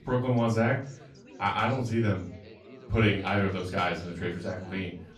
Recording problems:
off-mic speech; far
room echo; slight; dies away in 0.3 s
chatter from many people; faint; throughout; 20 dB below the speech

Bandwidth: 14.5 kHz